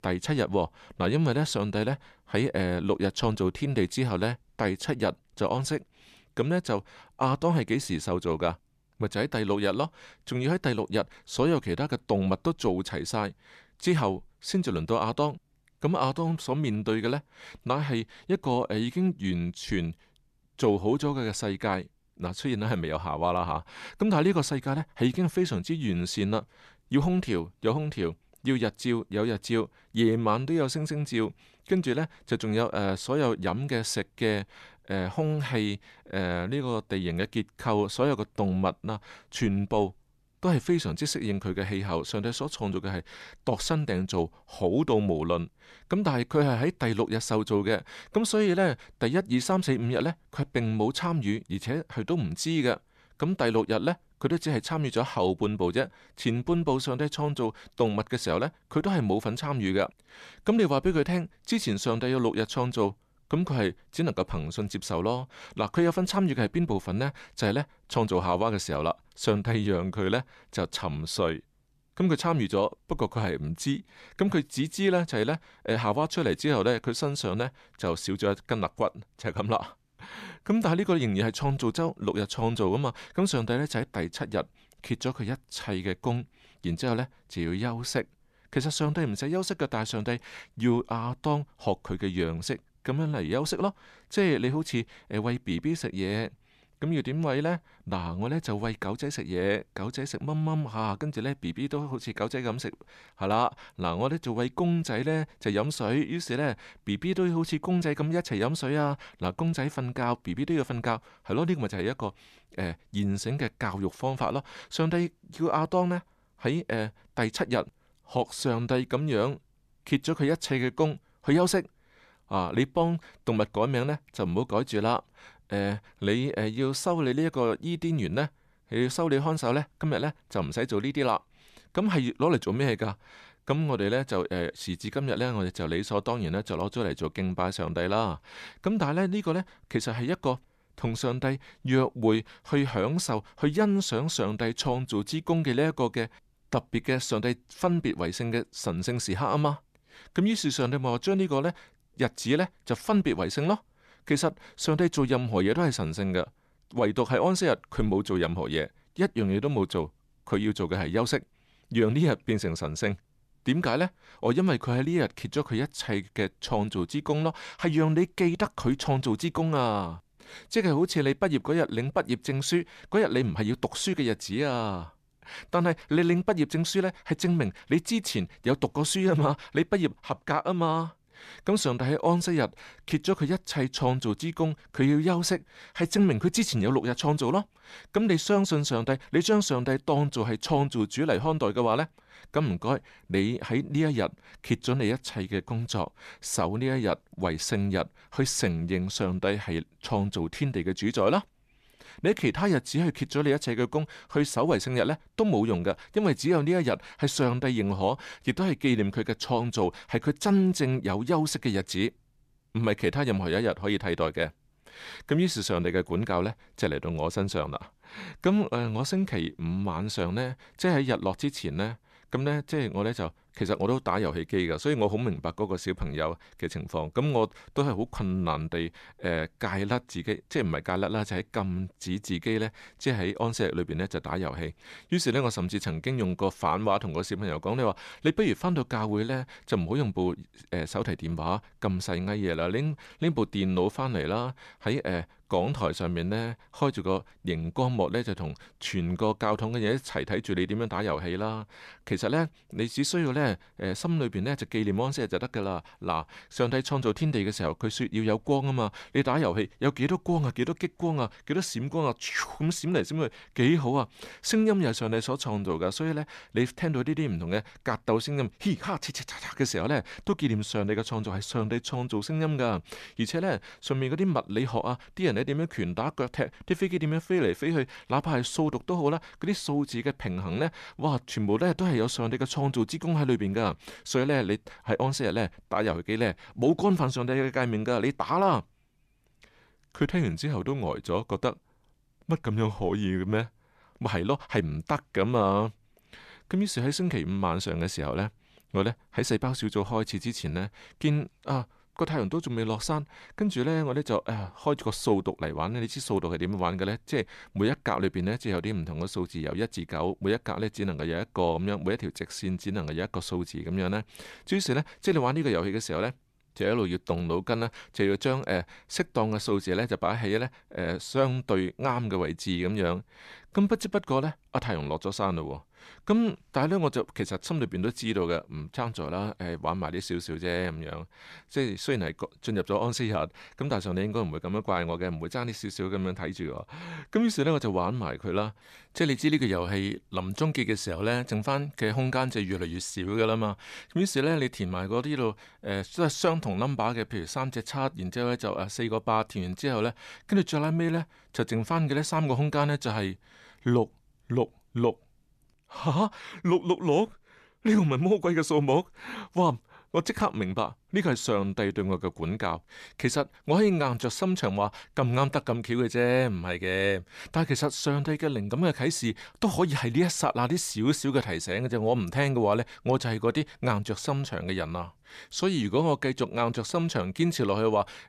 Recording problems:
none

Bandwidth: 14 kHz